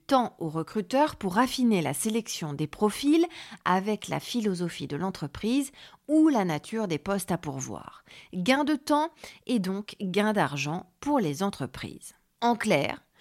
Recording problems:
none

